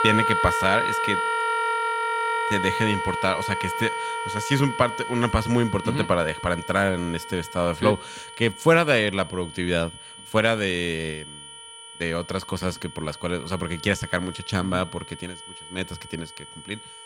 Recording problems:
background music; loud; throughout; 2 dB below the speech
high-pitched whine; noticeable; throughout; 3 kHz, 15 dB below the speech

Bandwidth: 16.5 kHz